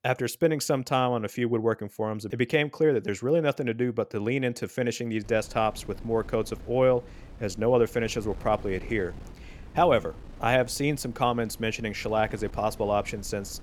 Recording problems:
wind noise on the microphone; occasional gusts; from 5 s on; 25 dB below the speech

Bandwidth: 19 kHz